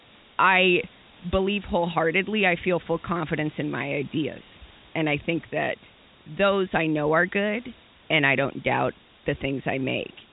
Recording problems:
high frequencies cut off; severe; nothing above 4 kHz
hiss; faint; throughout; 25 dB below the speech

